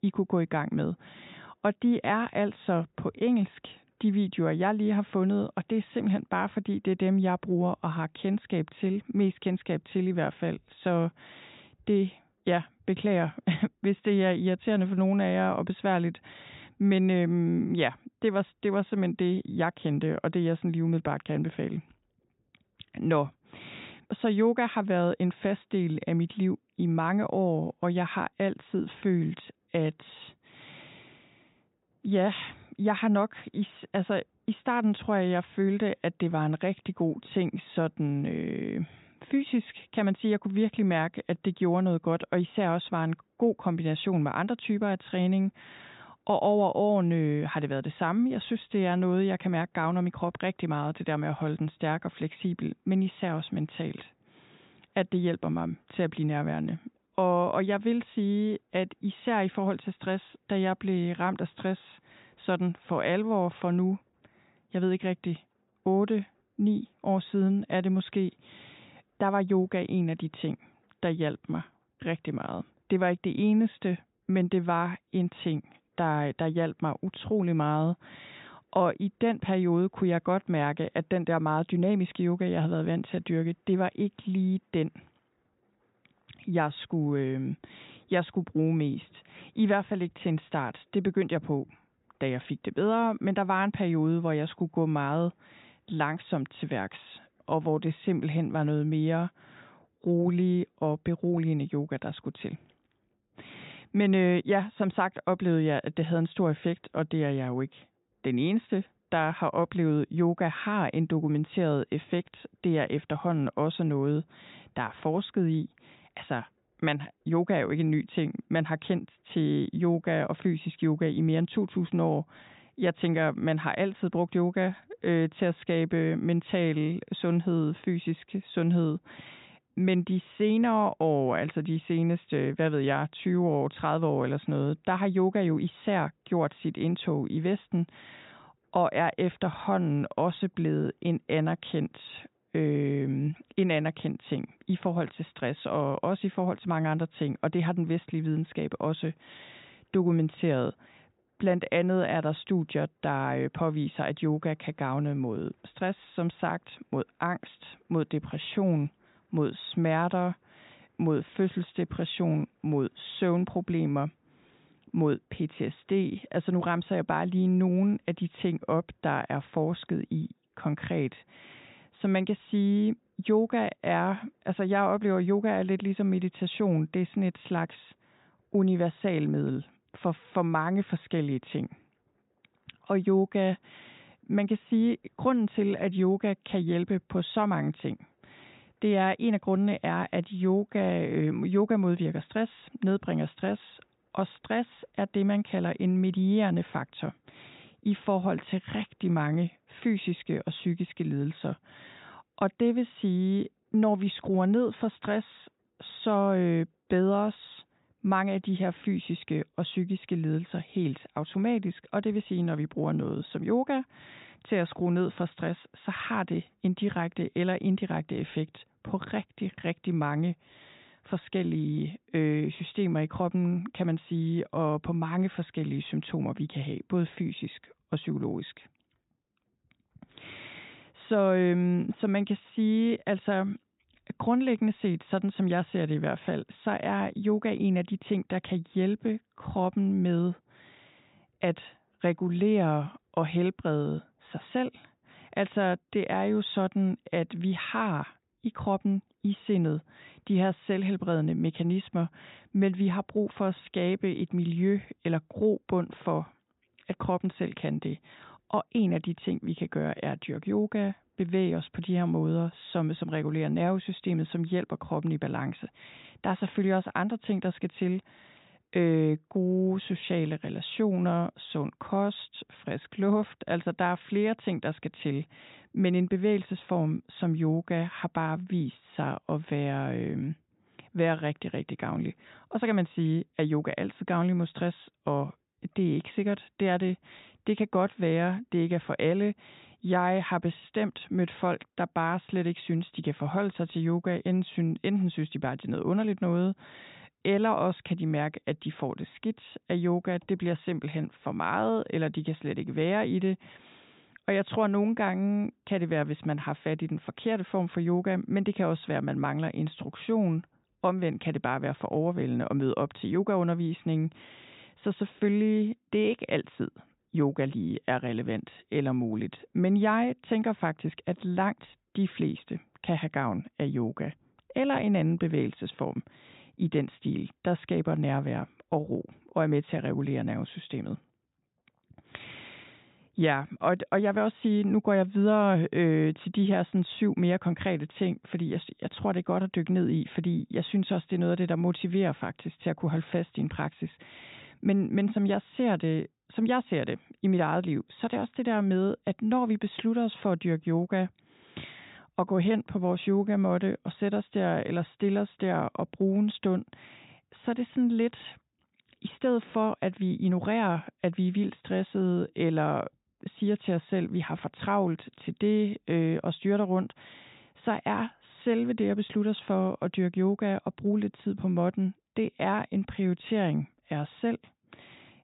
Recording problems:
high frequencies cut off; severe; nothing above 4 kHz

